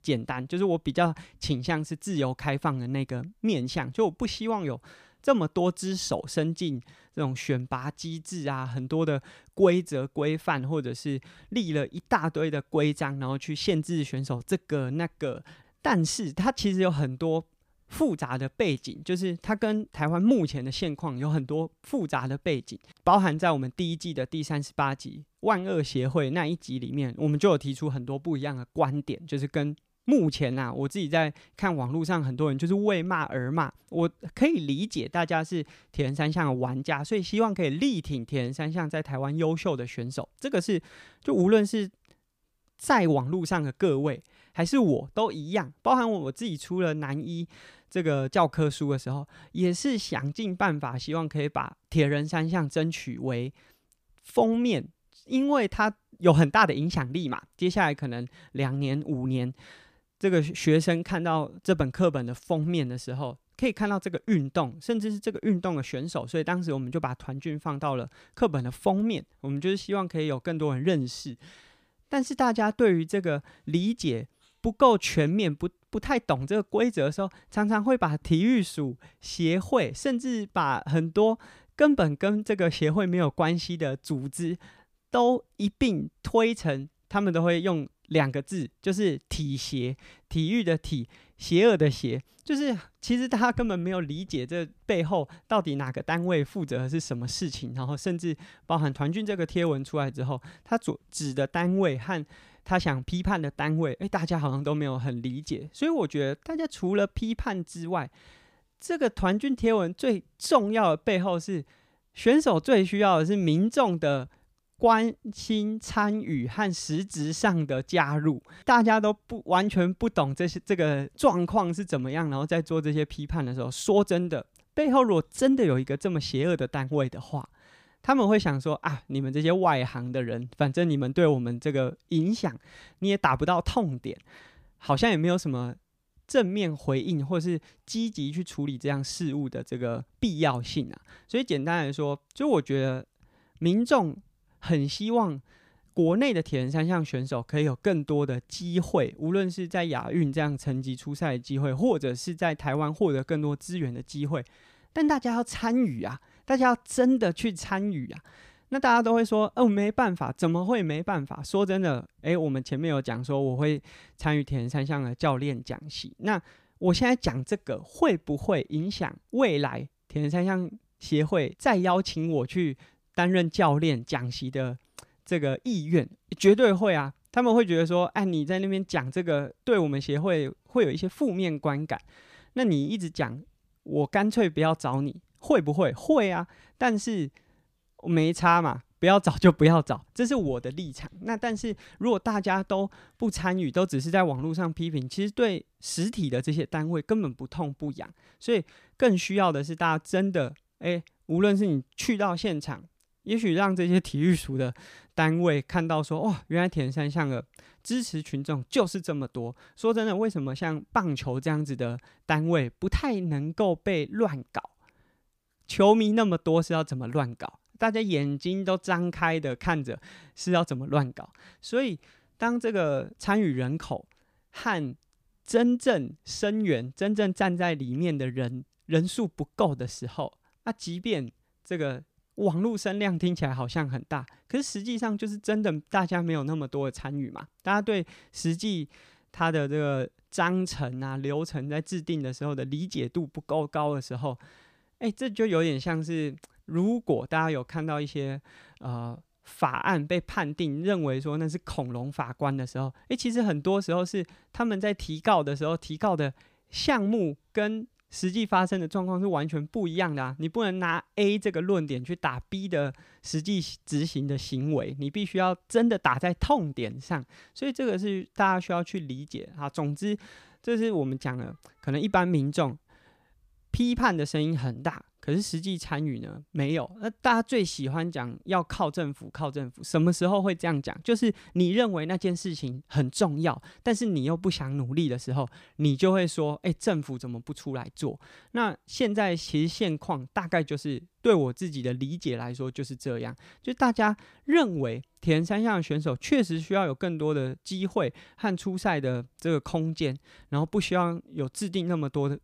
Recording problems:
none

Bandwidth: 15 kHz